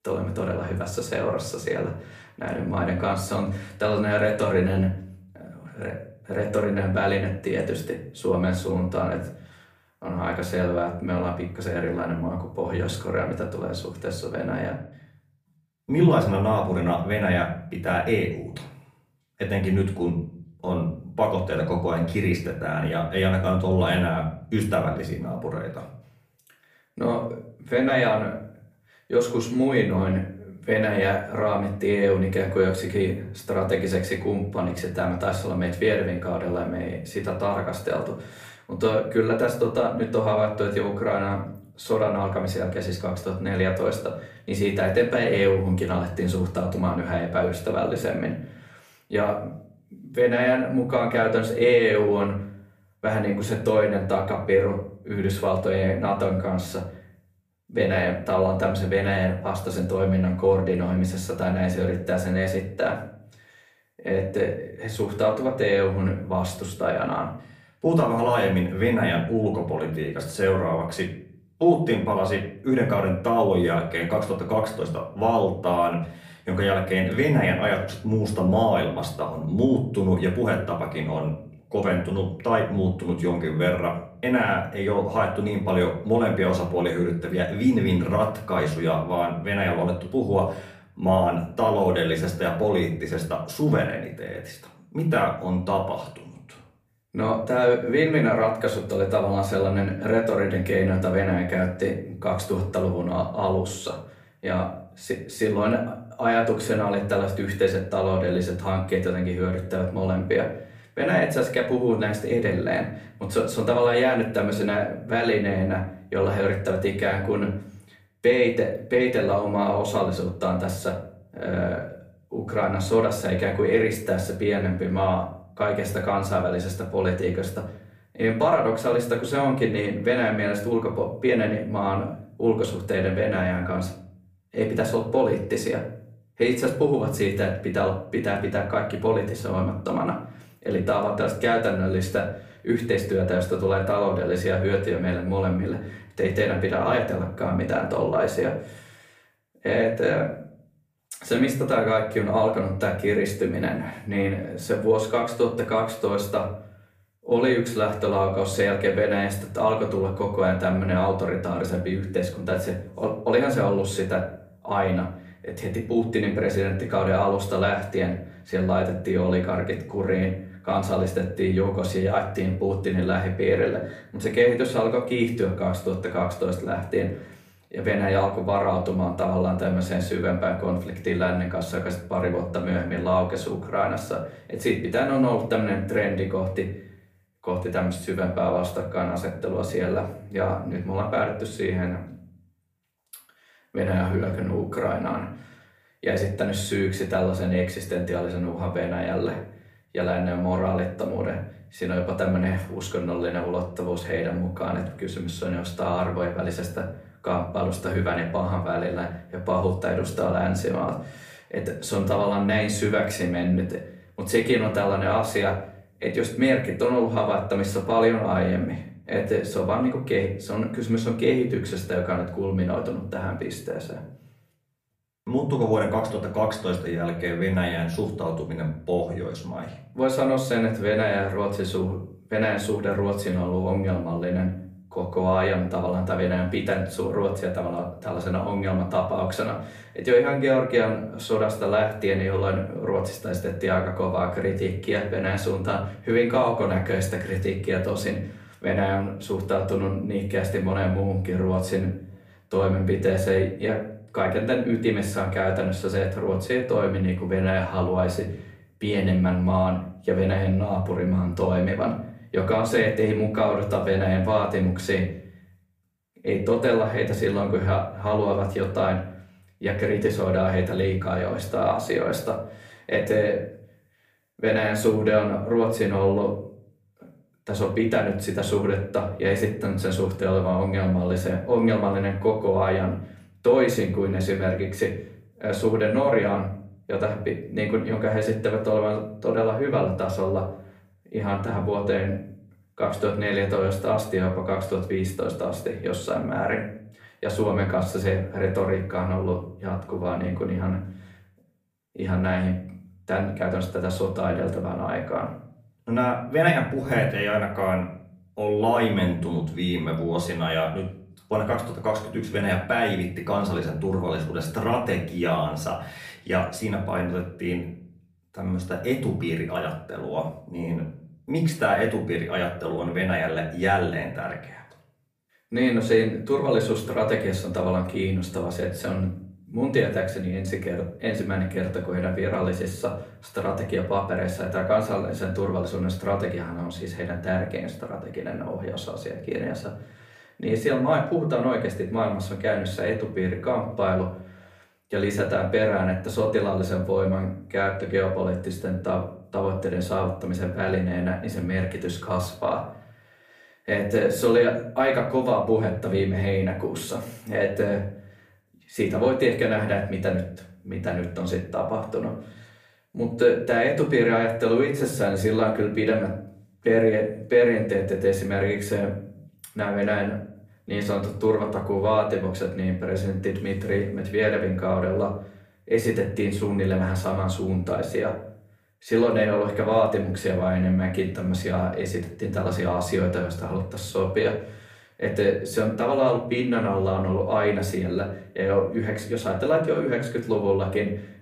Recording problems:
off-mic speech; far
room echo; slight; dies away in 0.5 s

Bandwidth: 15 kHz